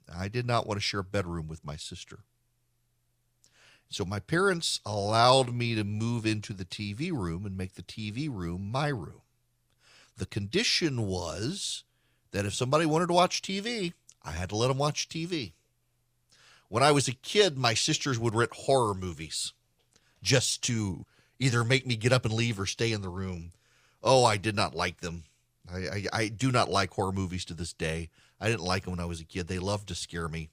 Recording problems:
uneven, jittery; slightly; from 5 to 21 s

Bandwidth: 15 kHz